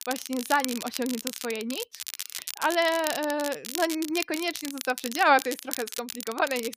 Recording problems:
crackle, like an old record; loud; 8 dB below the speech

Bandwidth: 15 kHz